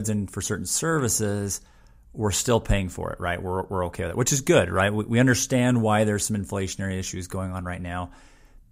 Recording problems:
abrupt cut into speech; at the start

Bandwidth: 15.5 kHz